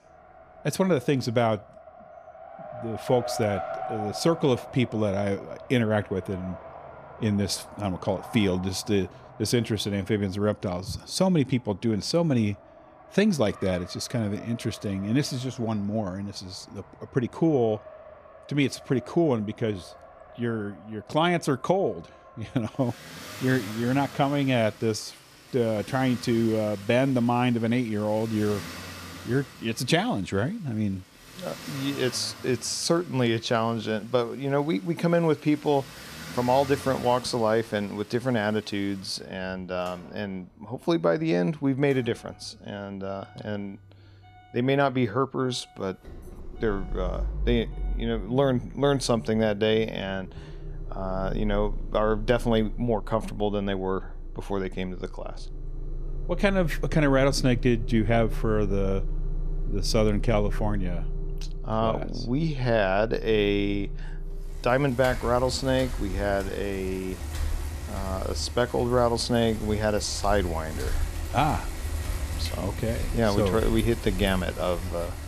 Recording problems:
traffic noise; noticeable; throughout; 10 dB below the speech

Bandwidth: 14.5 kHz